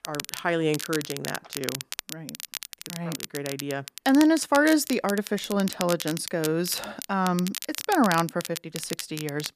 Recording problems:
crackle, like an old record; loud; 9 dB below the speech

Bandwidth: 14.5 kHz